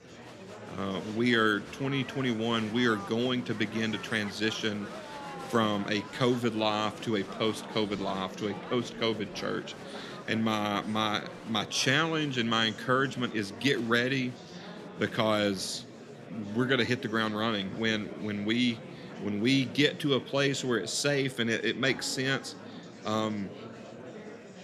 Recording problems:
murmuring crowd; noticeable; throughout; 15 dB below the speech

